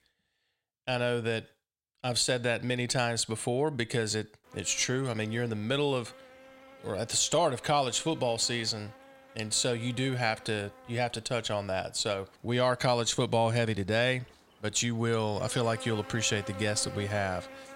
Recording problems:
electrical hum; noticeable; from 4.5 s on; 60 Hz, 15 dB below the speech

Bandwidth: 16 kHz